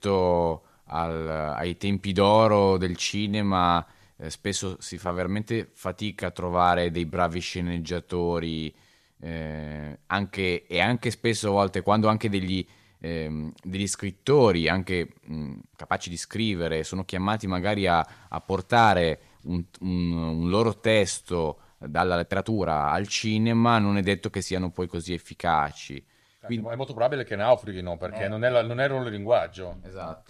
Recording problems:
uneven, jittery; strongly; from 1 to 27 s

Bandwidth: 14.5 kHz